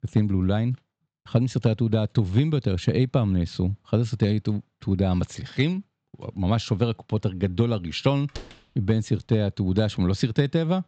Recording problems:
high frequencies cut off; noticeable; nothing above 8 kHz
door banging; faint; at 8.5 s; peak 15 dB below the speech

